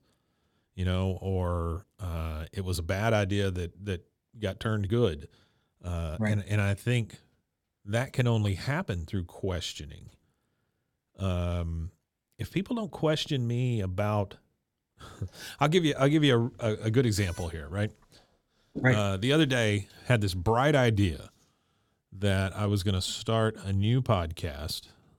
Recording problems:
none

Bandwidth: 17 kHz